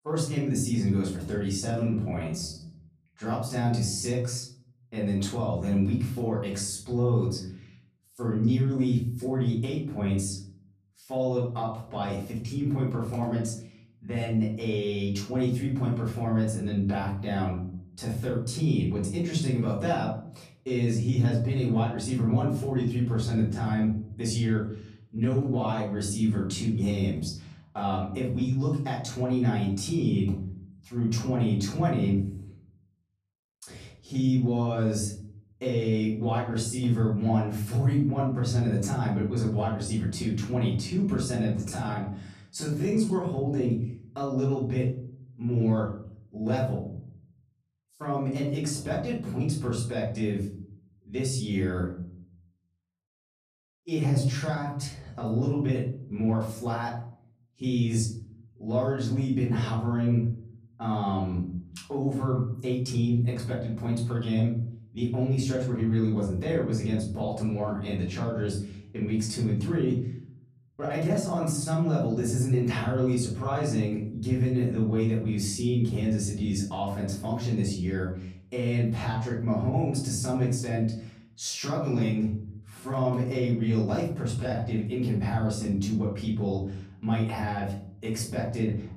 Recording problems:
off-mic speech; far
room echo; slight; dies away in 0.6 s
uneven, jittery; strongly; from 1.5 s to 1:25

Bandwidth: 14.5 kHz